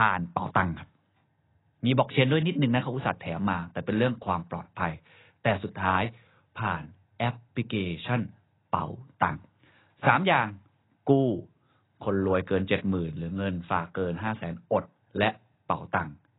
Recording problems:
garbled, watery; badly; nothing above 4 kHz
abrupt cut into speech; at the start

